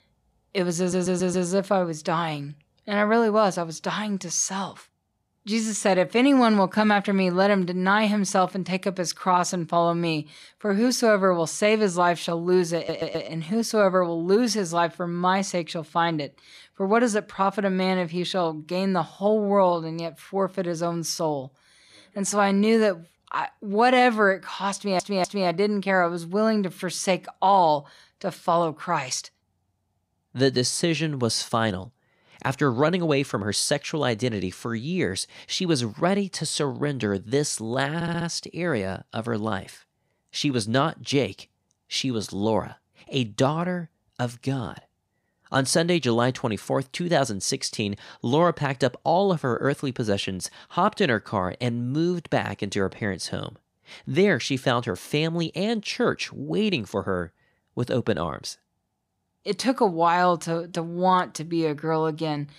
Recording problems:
audio stuttering; 4 times, first at 1 s

